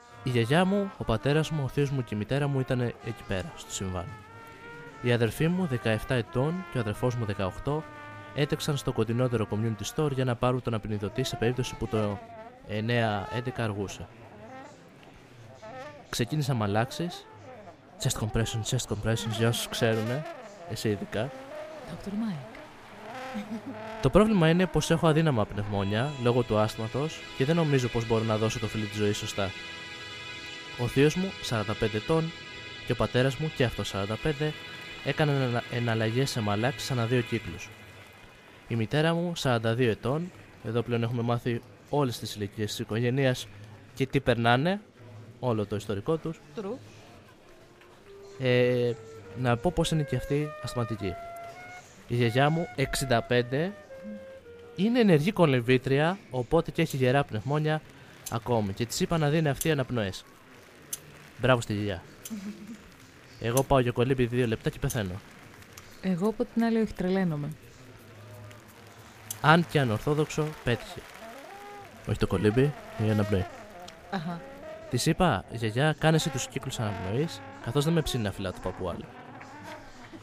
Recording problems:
background music; noticeable; throughout; 15 dB below the speech
murmuring crowd; faint; throughout; 20 dB below the speech

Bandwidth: 15 kHz